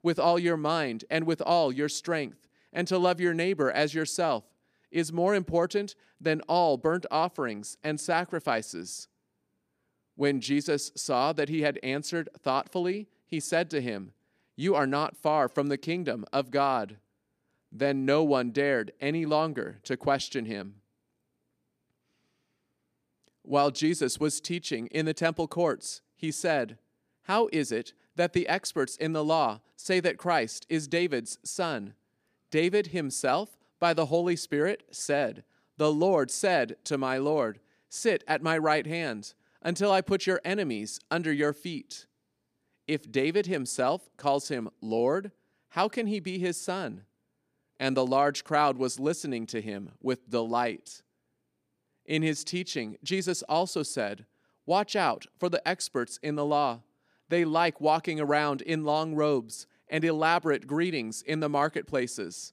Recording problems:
none

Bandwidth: 15 kHz